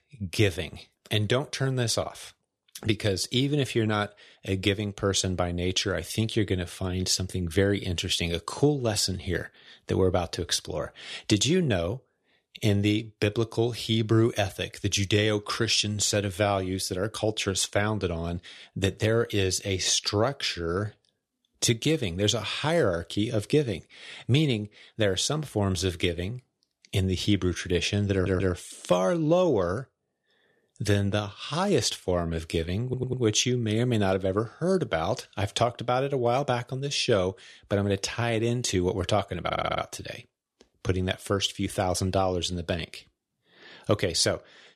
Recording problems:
audio stuttering; at 28 s, at 33 s and at 39 s

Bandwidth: 13.5 kHz